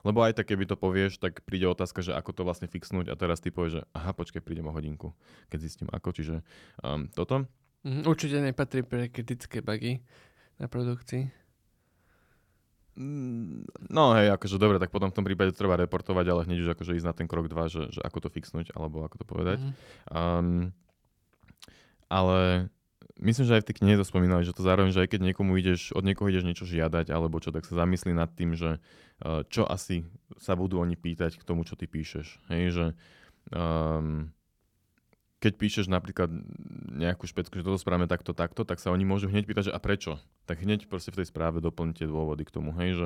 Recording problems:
abrupt cut into speech; at the end

